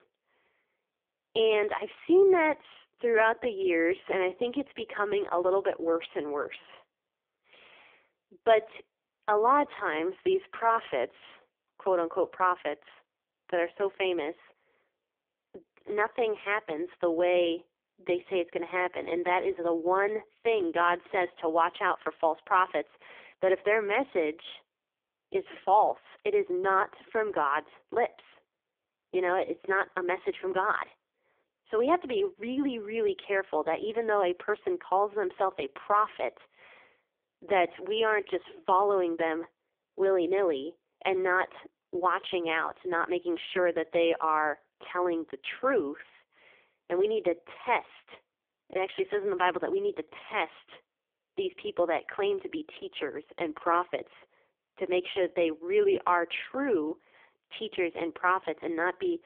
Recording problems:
phone-call audio; poor line; nothing above 3.5 kHz

